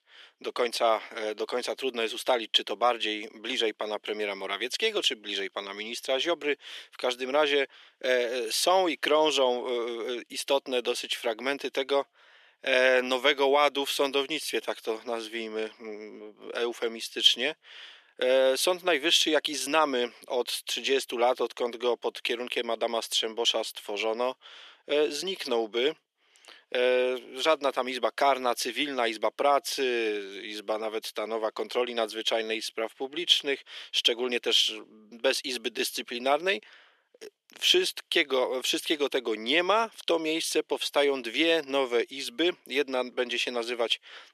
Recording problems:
thin; very; fading below 300 Hz

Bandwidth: 13.5 kHz